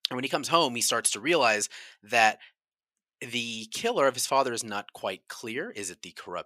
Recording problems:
thin; very slightly; fading below 500 Hz

